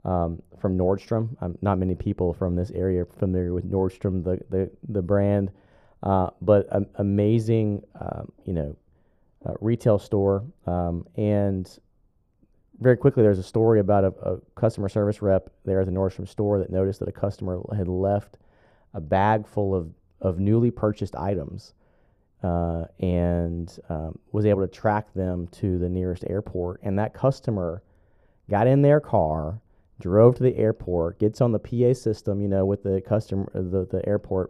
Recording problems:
muffled; very; fading above 1.5 kHz

